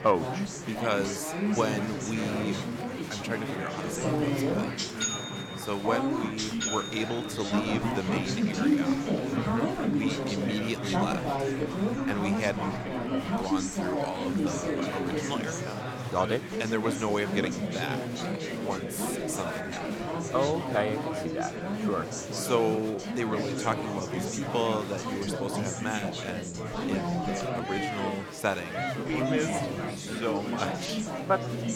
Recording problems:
chatter from many people; very loud; throughout; 2 dB above the speech

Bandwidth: 17 kHz